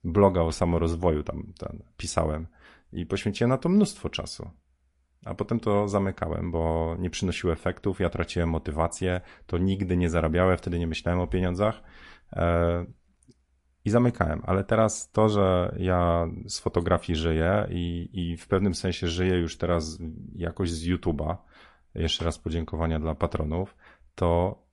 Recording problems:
garbled, watery; slightly; nothing above 11 kHz

